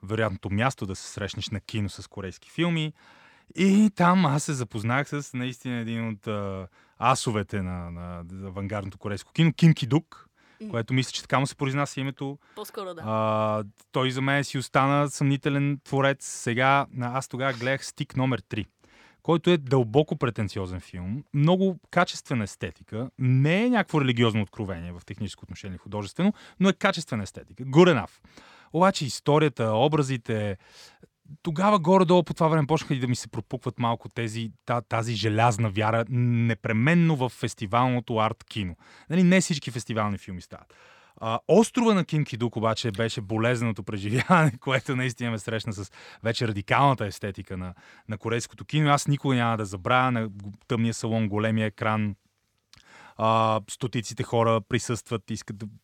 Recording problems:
none

